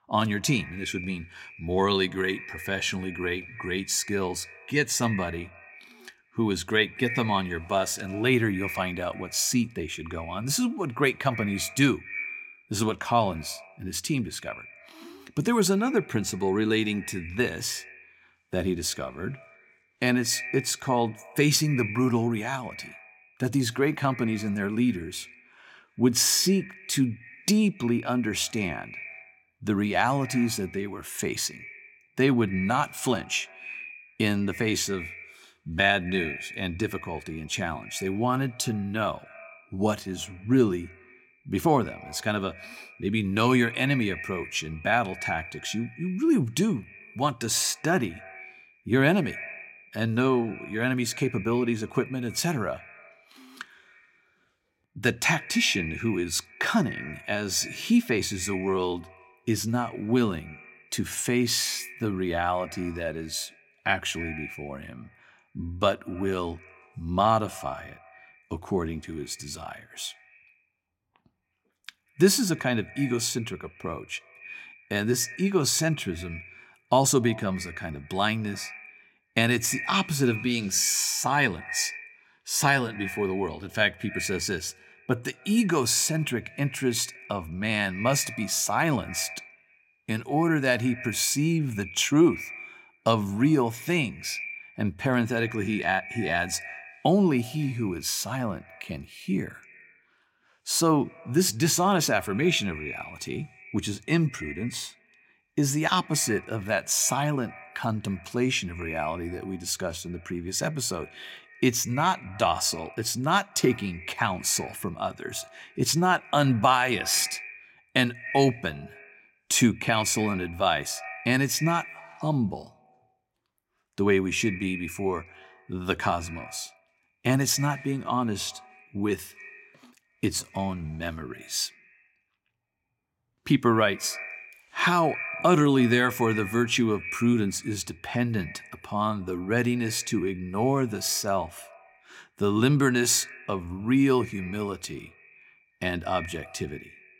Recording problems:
echo of what is said; noticeable; throughout; 90 ms later, 15 dB below the speech

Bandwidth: 16.5 kHz